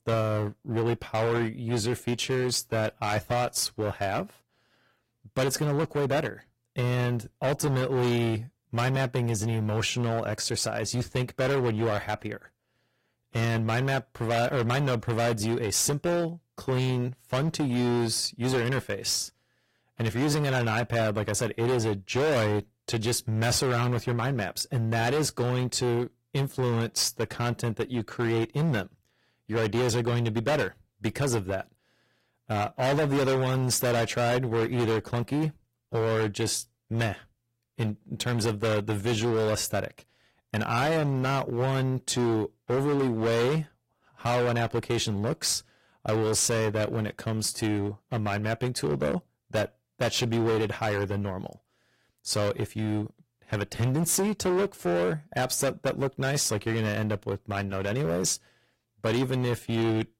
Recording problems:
distortion; heavy; 17% of the sound clipped
garbled, watery; slightly; nothing above 15.5 kHz

